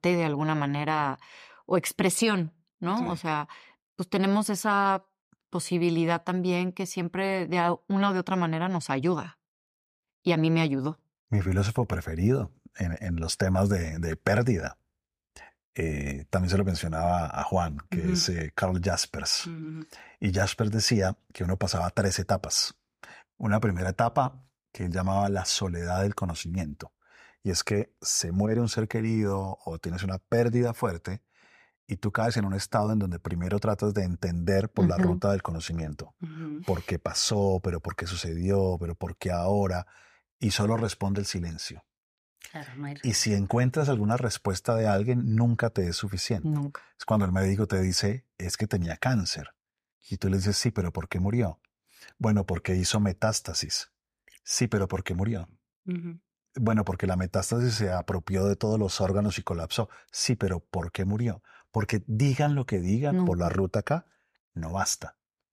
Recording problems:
none

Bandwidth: 15 kHz